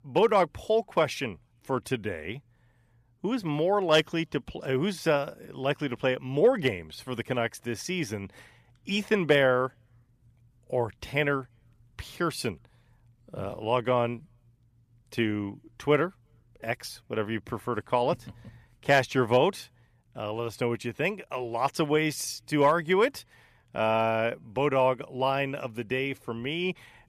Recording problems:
none

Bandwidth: 14.5 kHz